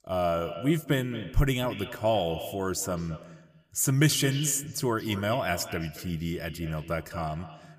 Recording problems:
echo of what is said; noticeable; throughout; 220 ms later, 15 dB below the speech

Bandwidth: 15 kHz